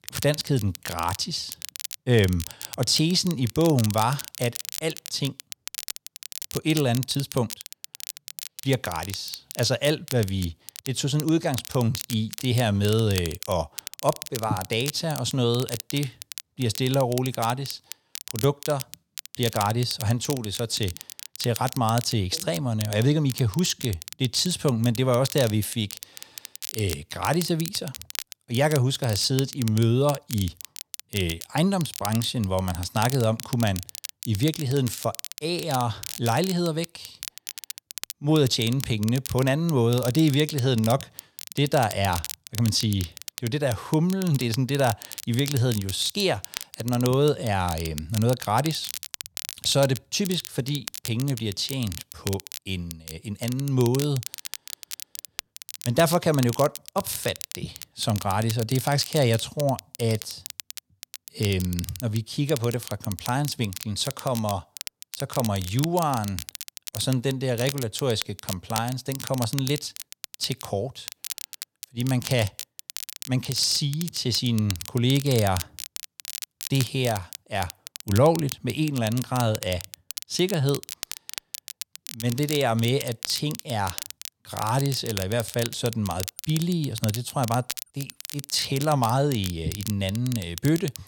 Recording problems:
crackle, like an old record; noticeable; 10 dB below the speech

